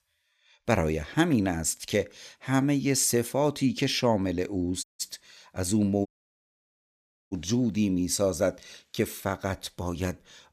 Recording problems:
audio cutting out; at 5 s and at 6 s for 1.5 s

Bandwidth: 14.5 kHz